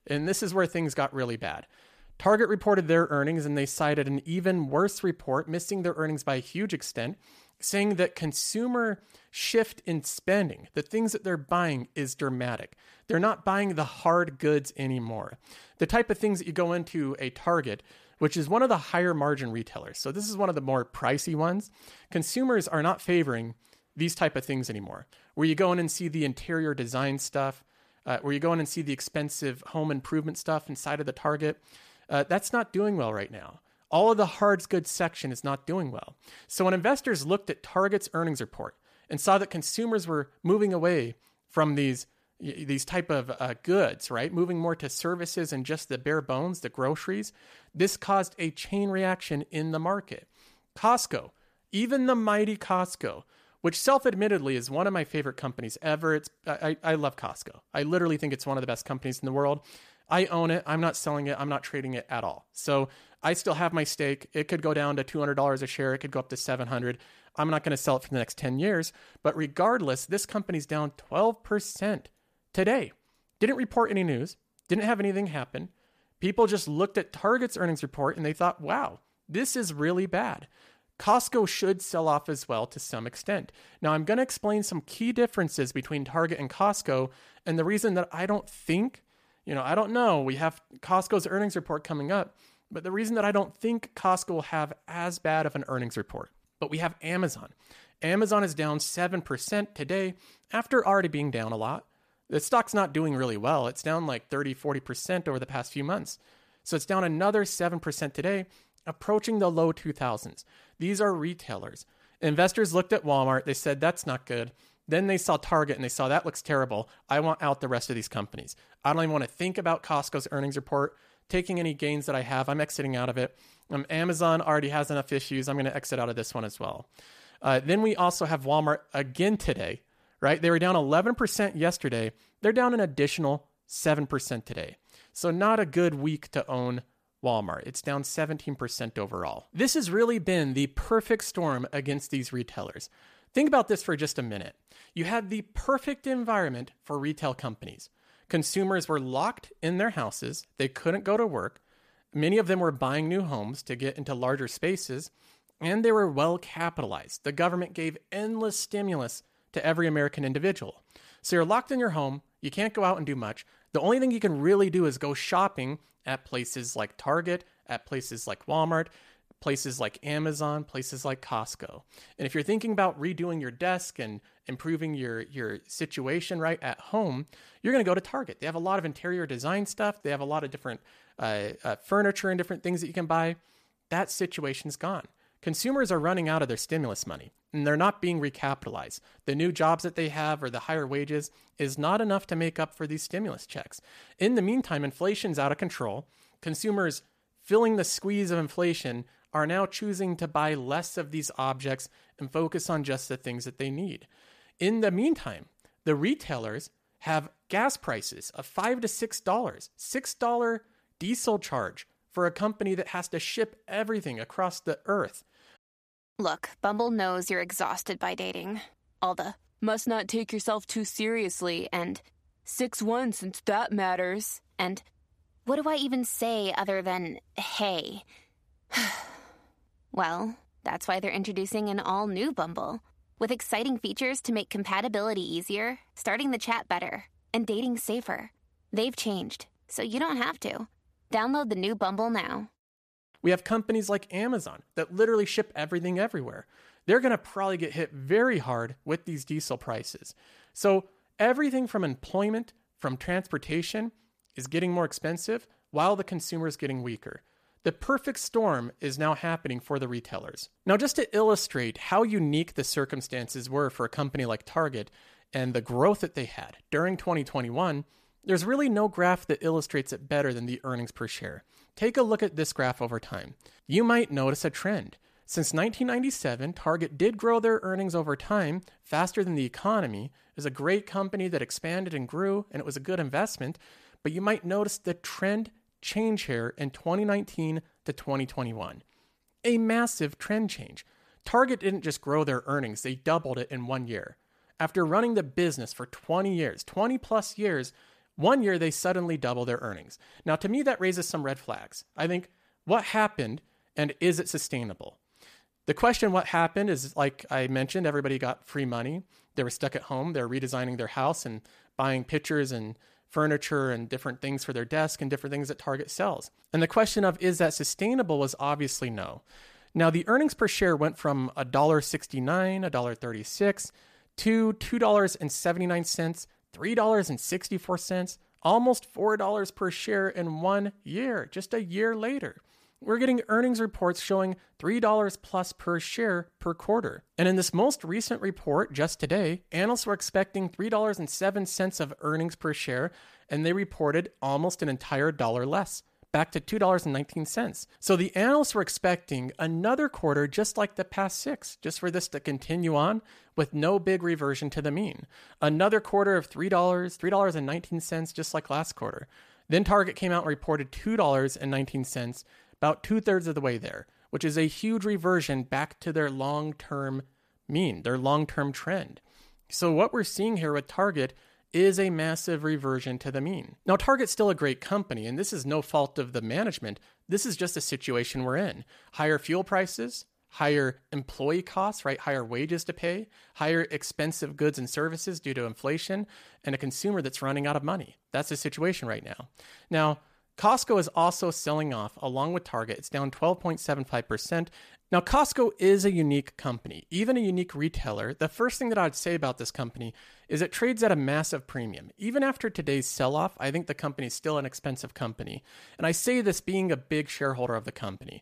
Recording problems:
none

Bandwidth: 14.5 kHz